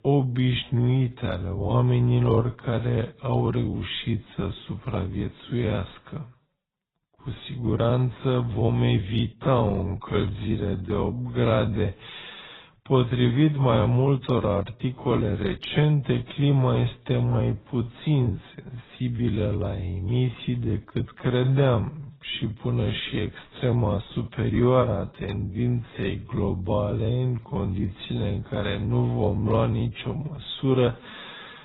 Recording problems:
garbled, watery; badly; nothing above 4 kHz
wrong speed, natural pitch; too slow; 0.5 times normal speed

